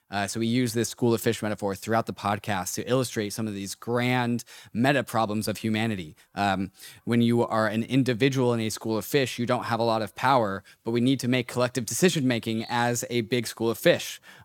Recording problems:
animal sounds; very faint; throughout; 25 dB below the speech

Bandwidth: 17 kHz